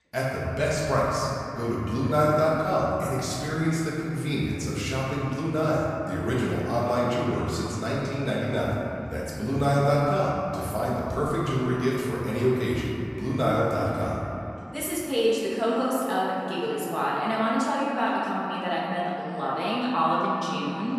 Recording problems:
room echo; strong; dies away in 2.7 s
off-mic speech; far
echo of what is said; faint; throughout; 470 ms later, 20 dB below the speech
voice in the background; faint; throughout; 30 dB below the speech

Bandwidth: 14.5 kHz